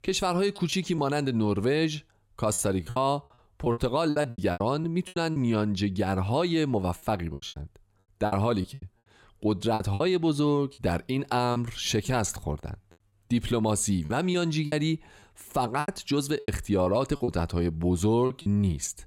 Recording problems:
choppy; very; 10% of the speech affected

